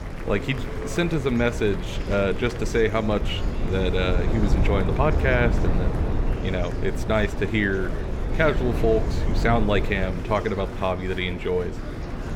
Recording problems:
murmuring crowd; noticeable; throughout; 10 dB below the speech
low rumble; noticeable; throughout; 10 dB below the speech

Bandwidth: 17.5 kHz